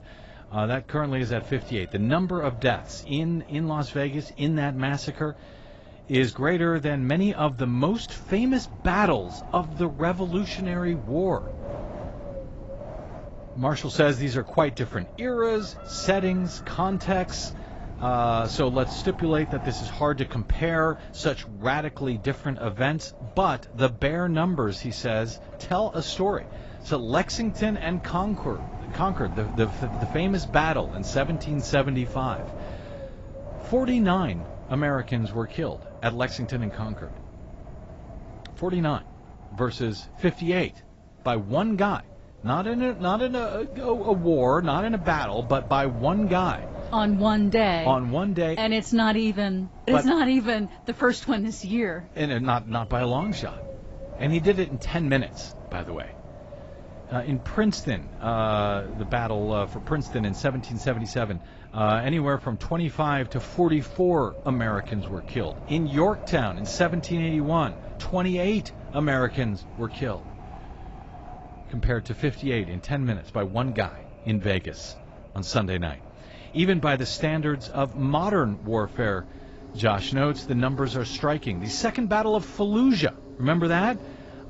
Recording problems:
garbled, watery; badly; nothing above 7.5 kHz
wind noise on the microphone; occasional gusts; 15 dB below the speech
animal sounds; faint; throughout; 25 dB below the speech

